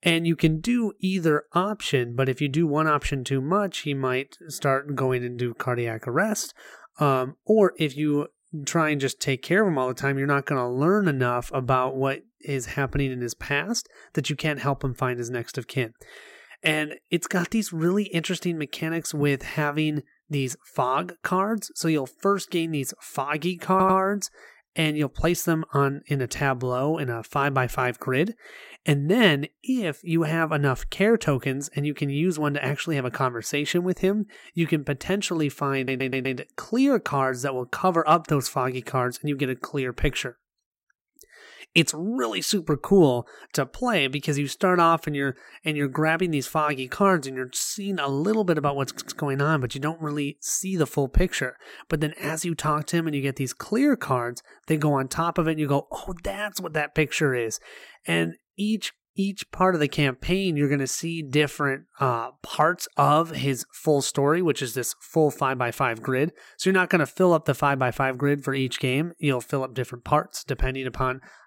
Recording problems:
audio stuttering; at 24 s, at 36 s and at 49 s

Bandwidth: 16 kHz